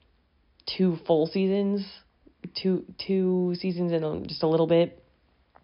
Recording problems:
high frequencies cut off; noticeable; nothing above 5.5 kHz

